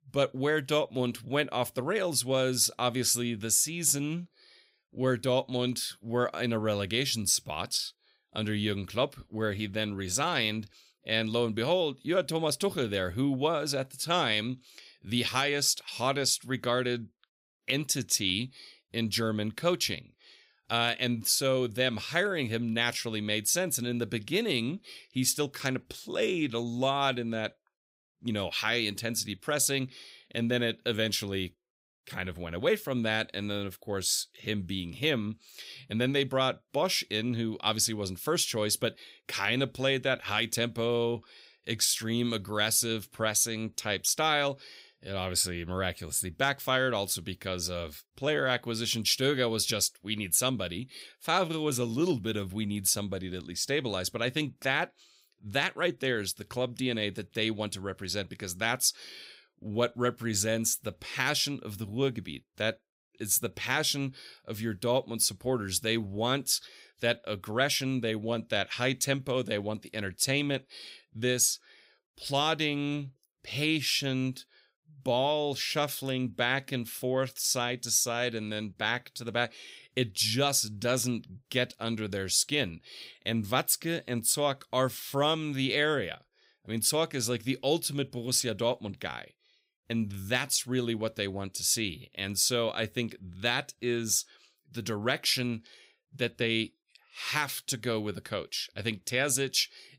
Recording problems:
none

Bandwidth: 15.5 kHz